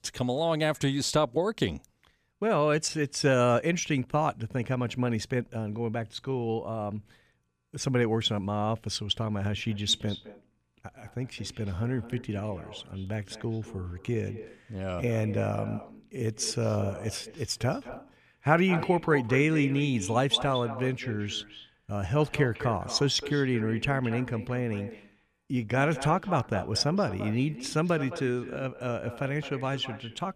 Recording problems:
echo of what is said; noticeable; from 9.5 s on; 210 ms later, 15 dB below the speech

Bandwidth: 14.5 kHz